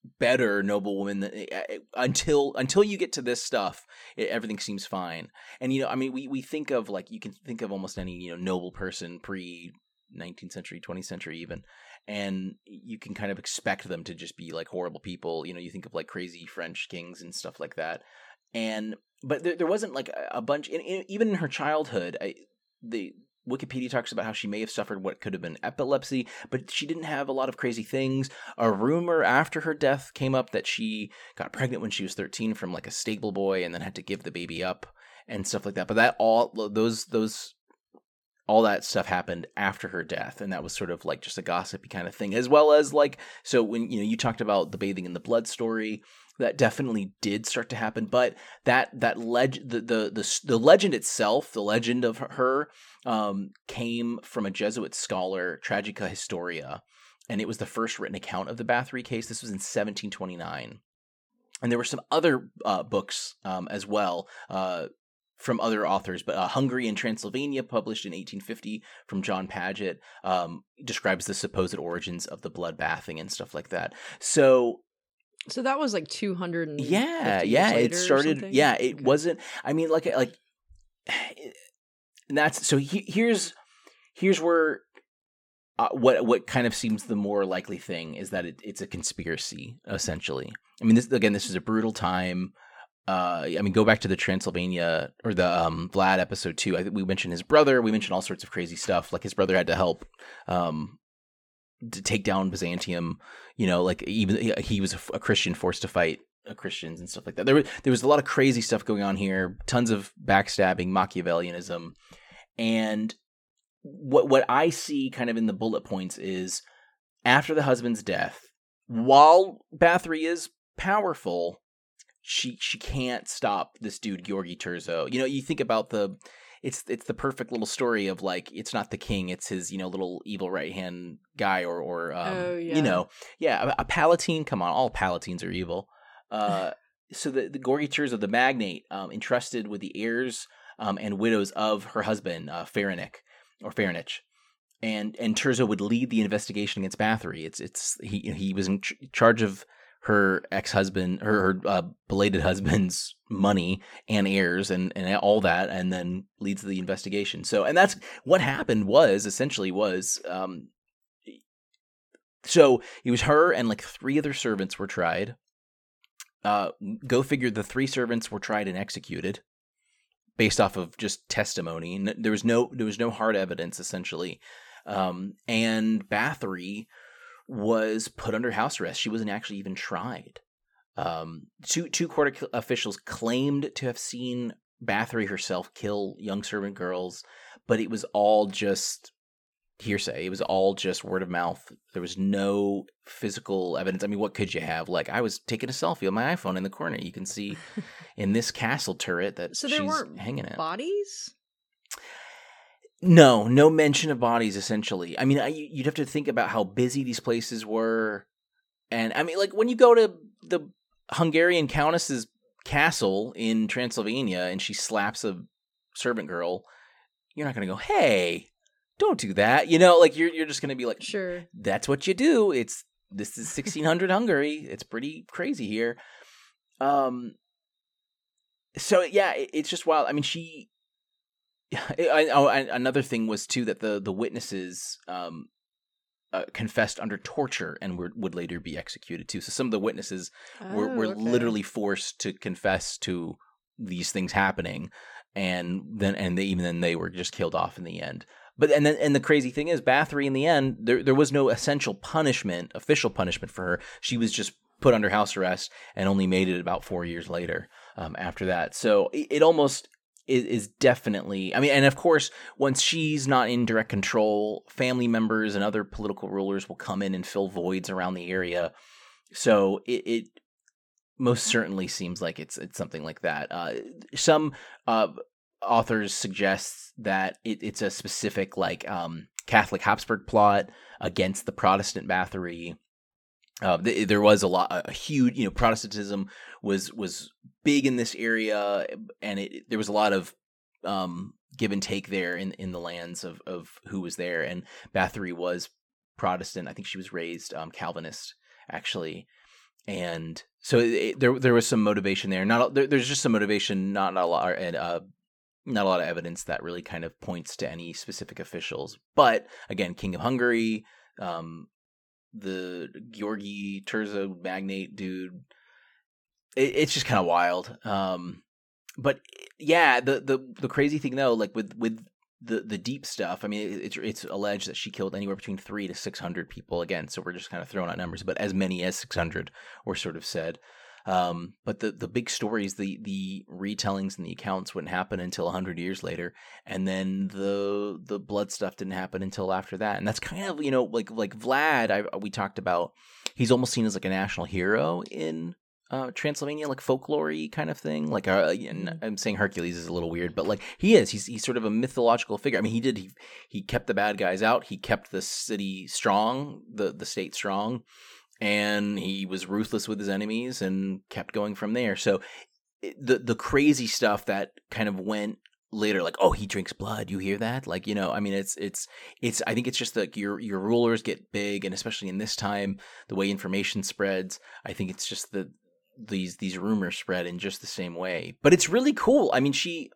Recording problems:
none

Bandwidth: 18 kHz